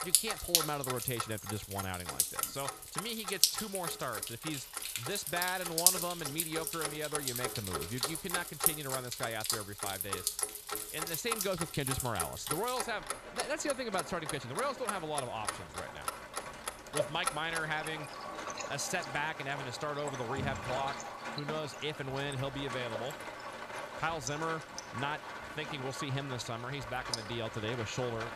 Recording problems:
rain or running water; very loud; throughout; 1 dB above the speech
household noises; loud; throughout; 4 dB below the speech

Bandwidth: 14 kHz